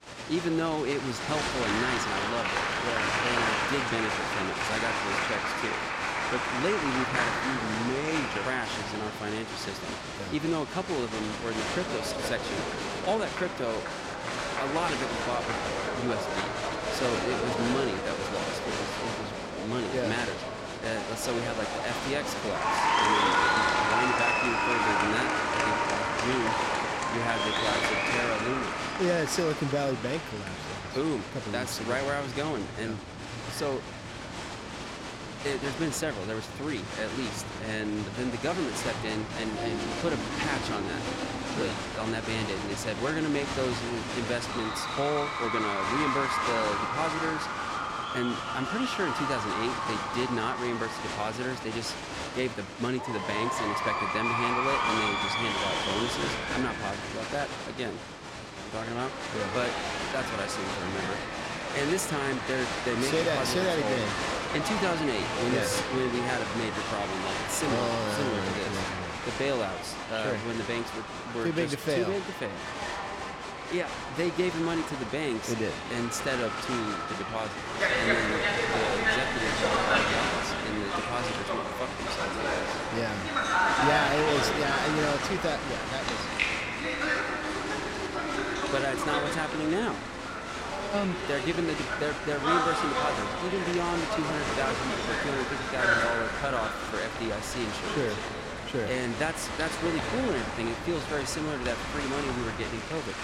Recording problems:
crowd noise; very loud; throughout; 2 dB above the speech

